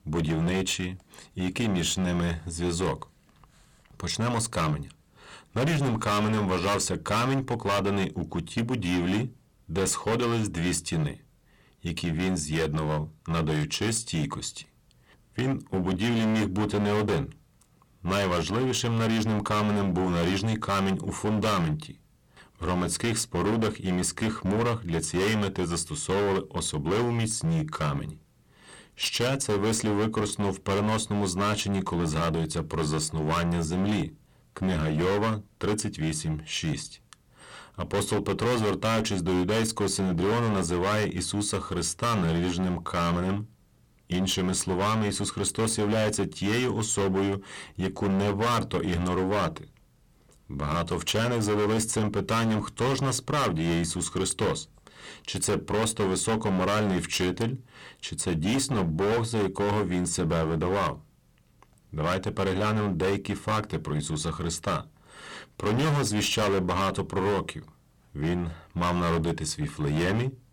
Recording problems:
distortion; heavy; 19% of the sound clipped

